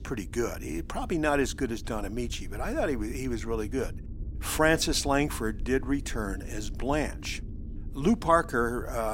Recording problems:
low rumble; faint; throughout; 25 dB below the speech
abrupt cut into speech; at the end

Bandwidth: 16 kHz